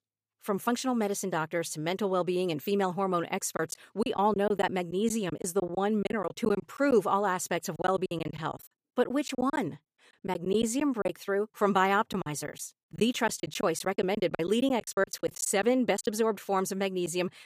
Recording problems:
choppy; very; from 3.5 to 7 s, from 8 to 11 s and from 12 to 16 s; 15% of the speech affected

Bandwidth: 15 kHz